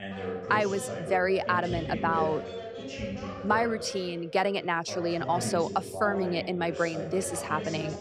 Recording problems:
background chatter; loud; throughout; 2 voices, 7 dB below the speech

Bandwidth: 15.5 kHz